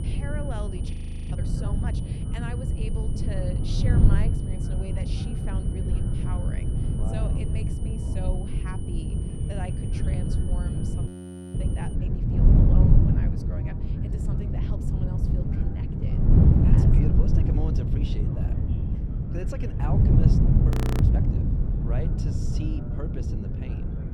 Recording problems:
wind noise on the microphone; heavy; 5 dB above the speech
electrical hum; loud; throughout; 50 Hz, 9 dB below the speech
high-pitched whine; loud; until 12 s; 9.5 kHz, 9 dB below the speech
voice in the background; noticeable; throughout; 15 dB below the speech
audio freezing; at 1 s, at 11 s and at 21 s

